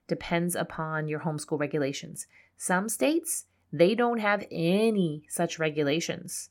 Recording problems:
none

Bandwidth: 17 kHz